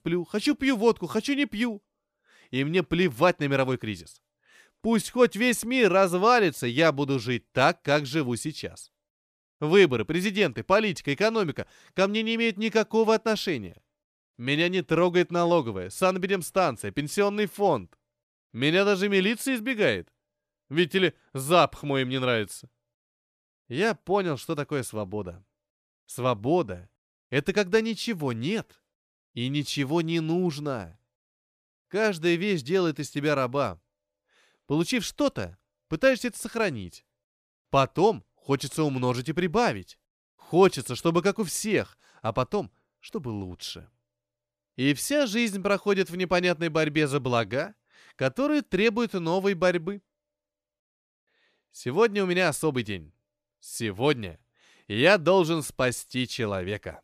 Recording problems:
none

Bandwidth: 14.5 kHz